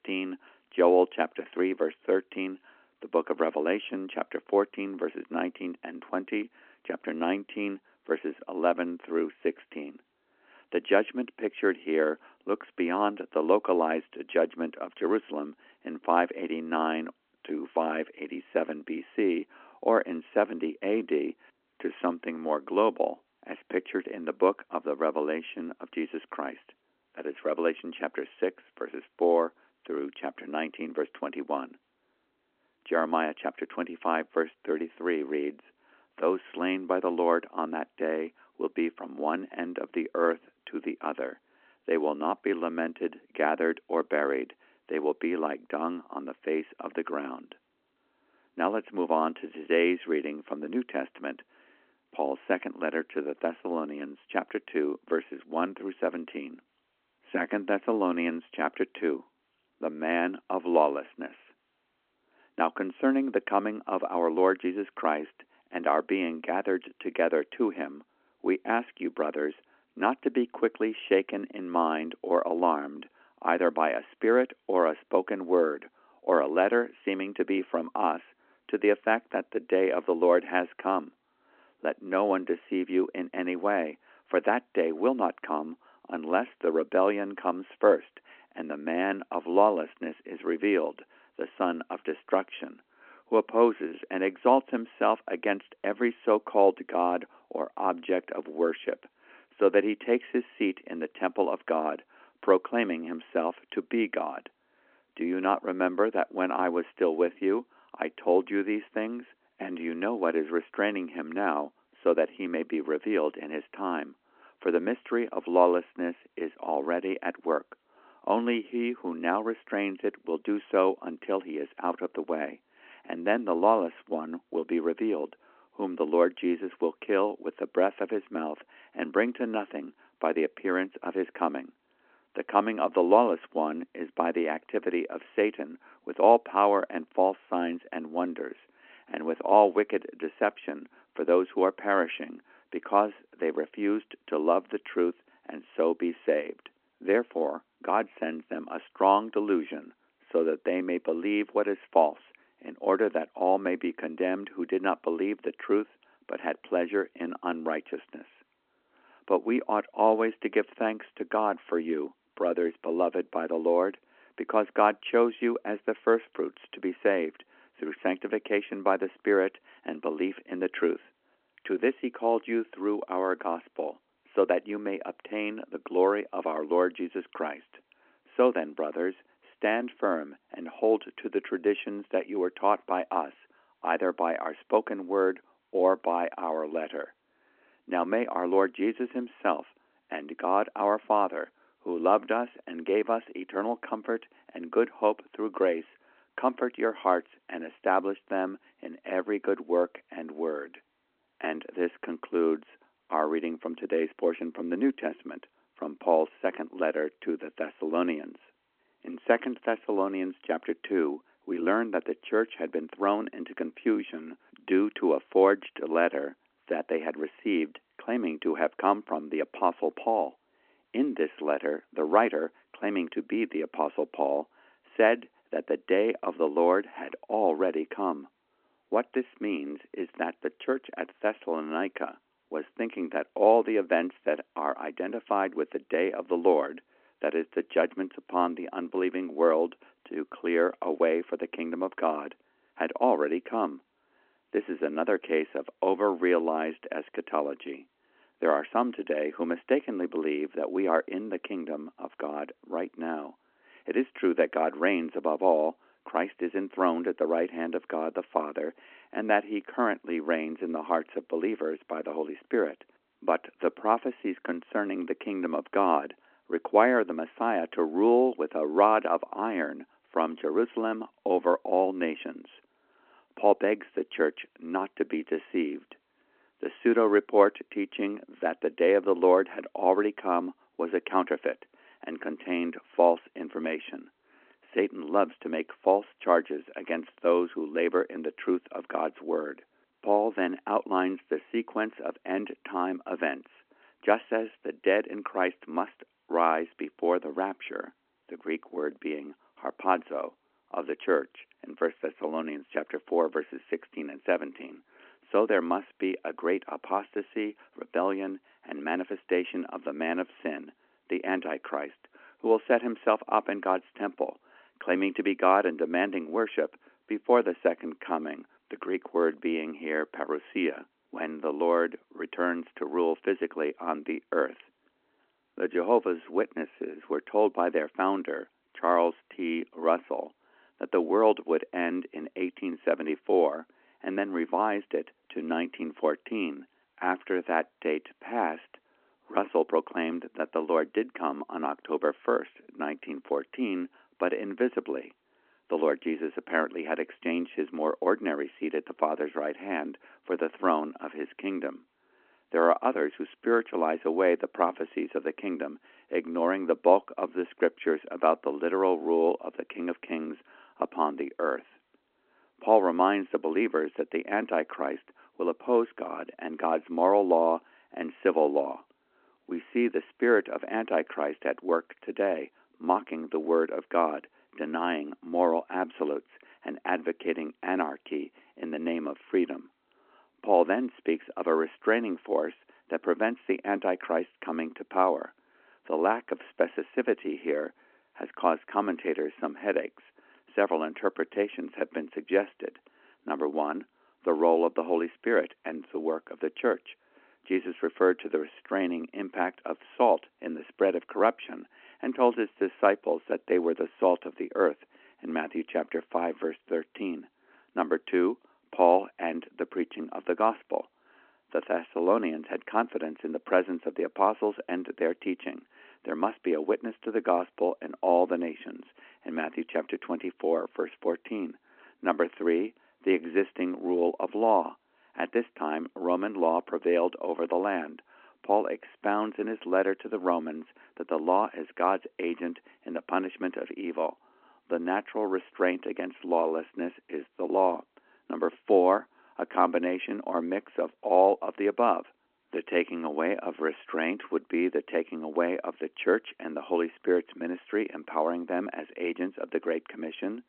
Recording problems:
phone-call audio

